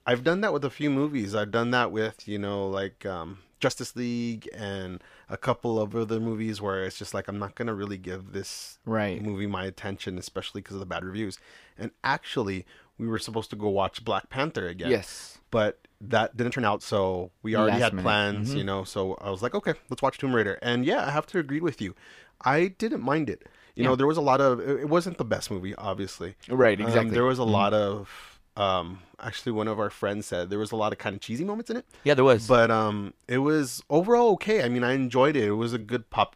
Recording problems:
uneven, jittery; strongly; from 1 to 36 s

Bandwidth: 15 kHz